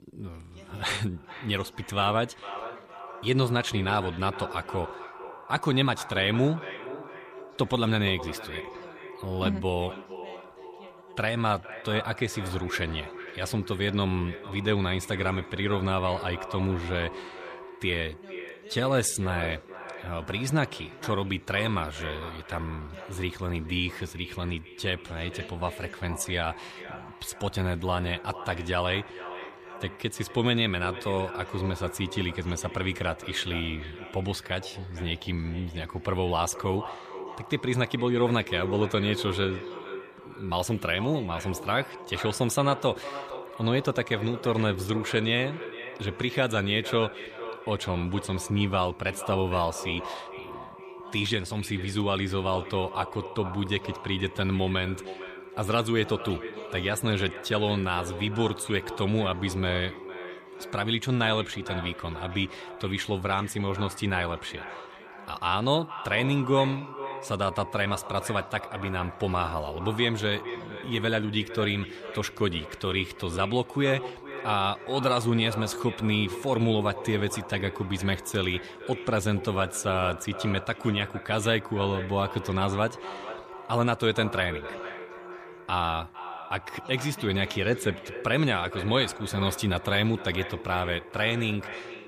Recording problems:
echo of what is said; noticeable; throughout; 460 ms later, 10 dB below the speech
voice in the background; faint; throughout; 25 dB below the speech

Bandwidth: 14.5 kHz